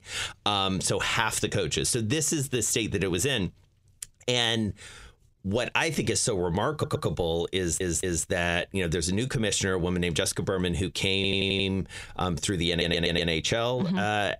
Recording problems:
squashed, flat; heavily
audio stuttering; 4 times, first at 6.5 s

